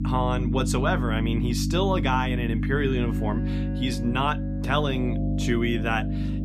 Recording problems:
electrical hum; loud; throughout; 50 Hz, 8 dB below the speech
background music; noticeable; from 3.5 s on; 15 dB below the speech

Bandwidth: 14.5 kHz